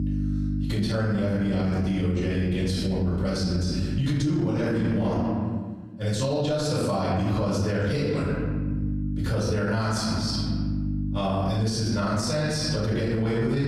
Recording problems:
room echo; strong; dies away in 1.2 s
off-mic speech; far
squashed, flat; heavily
electrical hum; noticeable; until 5.5 s and from 8 s on; 50 Hz, 15 dB below the speech

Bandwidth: 15.5 kHz